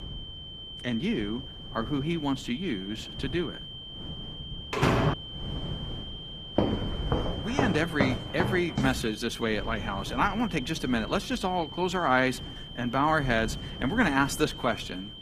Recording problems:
garbled, watery; slightly; nothing above 15 kHz
high-pitched whine; noticeable; throughout; 3 kHz, 10 dB below the speech
wind noise on the microphone; occasional gusts; 20 dB below the speech
door banging; loud; at 4.5 s; peak 5 dB above the speech
footsteps; loud; from 6.5 to 9 s; peak level with the speech

